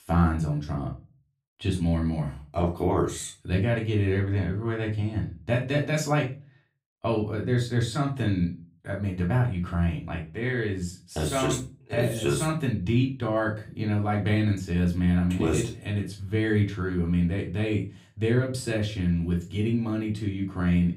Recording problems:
off-mic speech; far
room echo; slight; dies away in 0.3 s

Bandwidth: 15.5 kHz